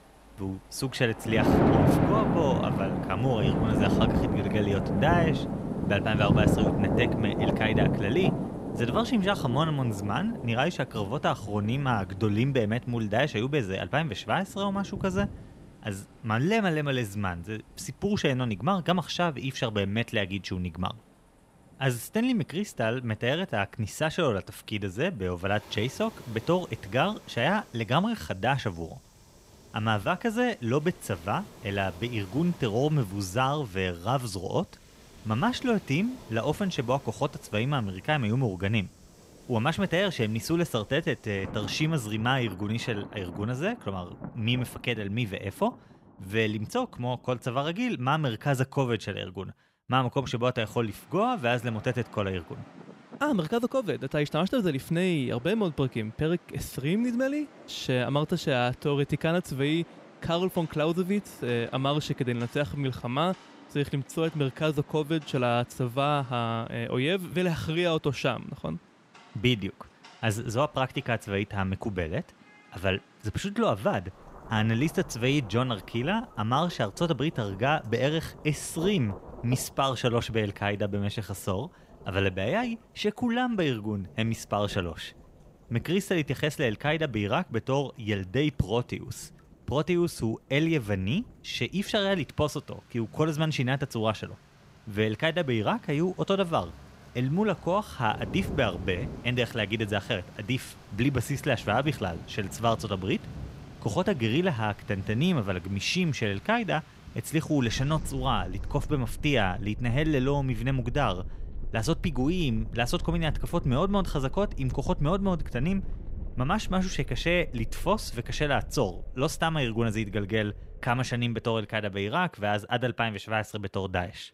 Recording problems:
rain or running water; loud; throughout; 5 dB below the speech

